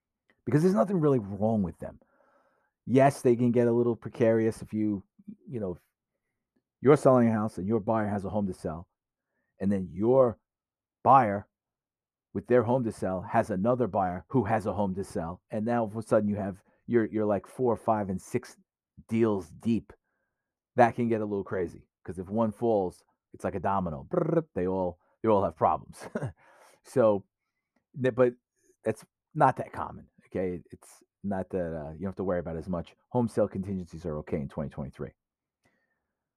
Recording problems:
muffled; slightly; fading above 1.5 kHz

